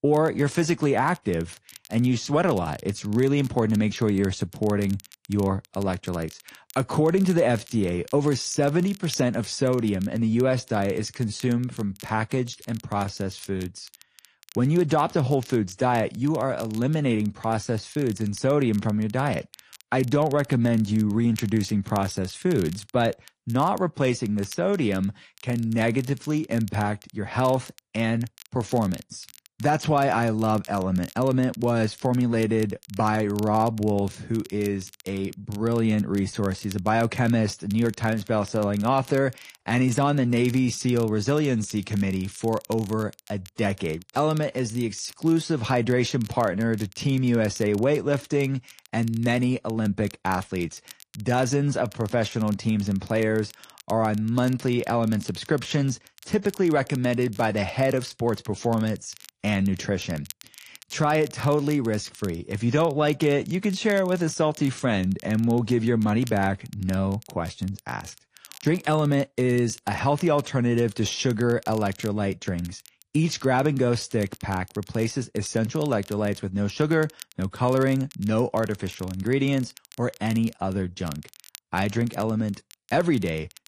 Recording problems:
garbled, watery; slightly; nothing above 10.5 kHz
crackle, like an old record; faint; 20 dB below the speech

